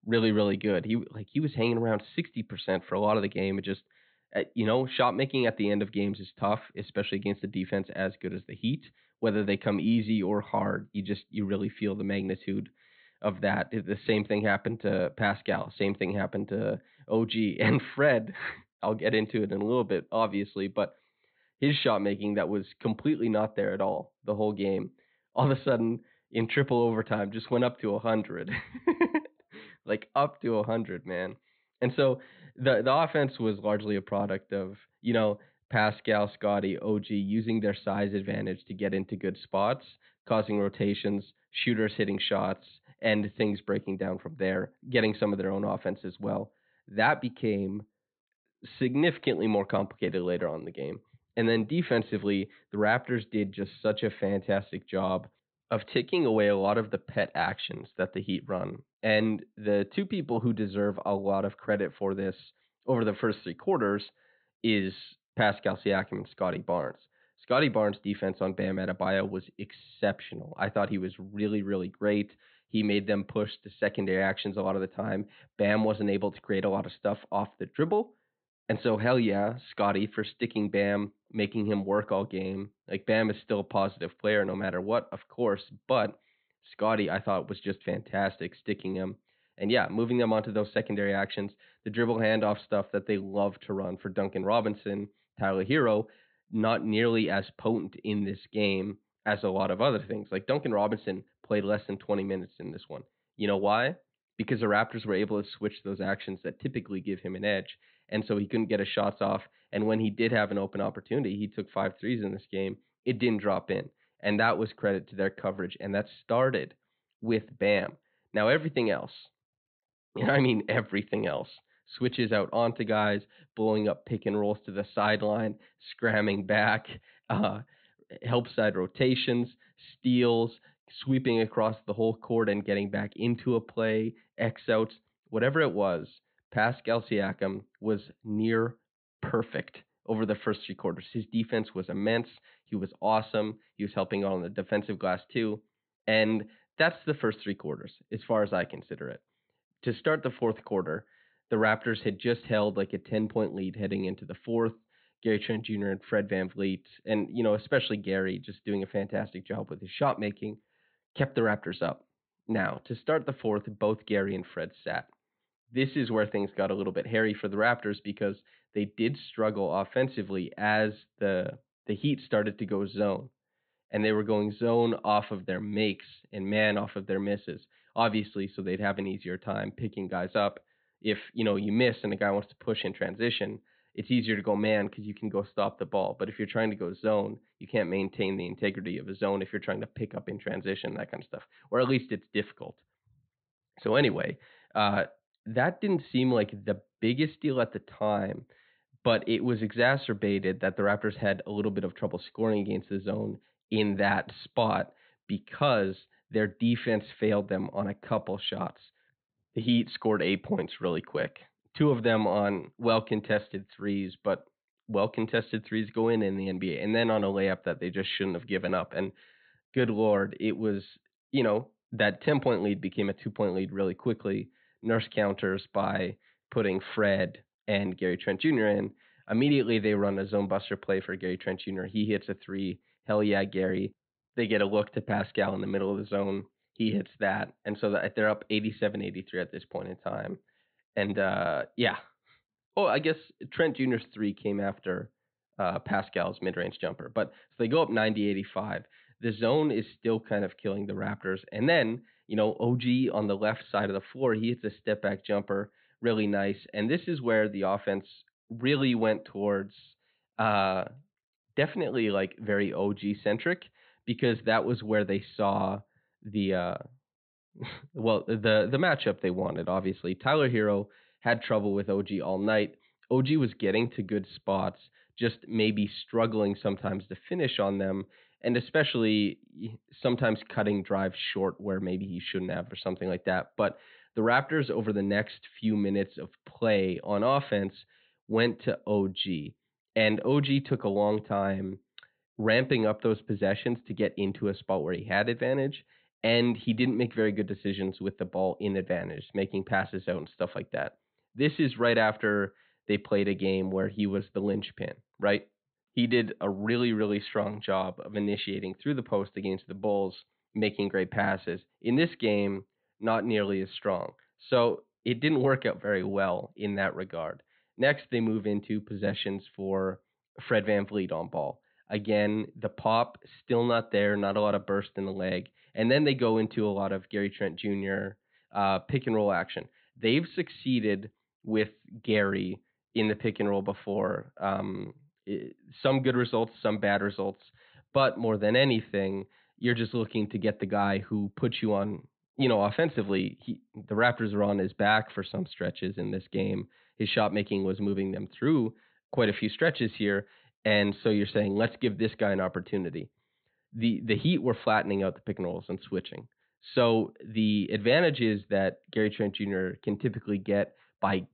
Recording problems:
high frequencies cut off; severe; nothing above 4 kHz

